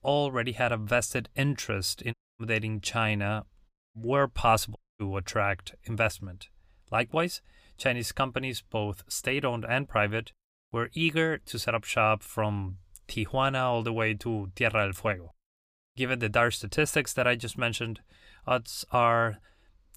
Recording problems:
audio cutting out; at 2 s, at 3.5 s and at 5 s

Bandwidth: 15 kHz